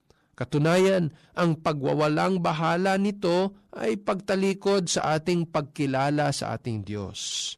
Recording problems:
distortion; slight; 10 dB below the speech

